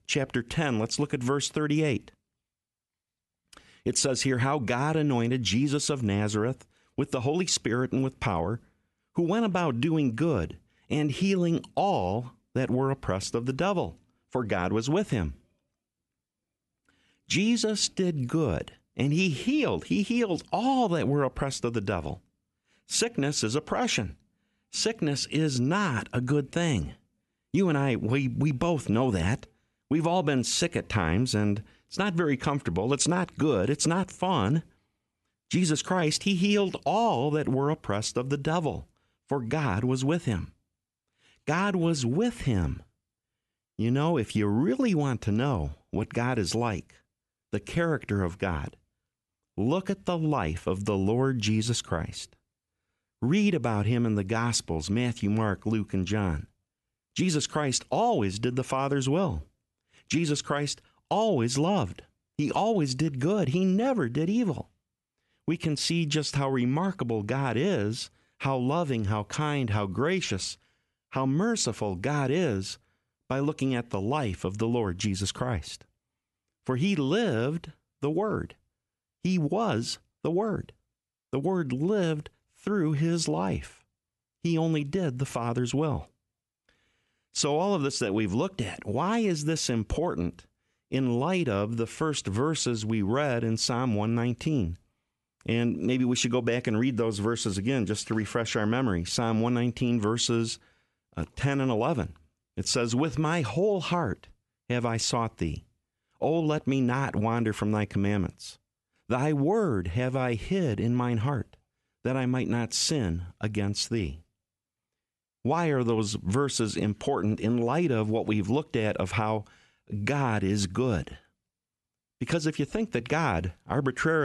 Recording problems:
abrupt cut into speech; at the end

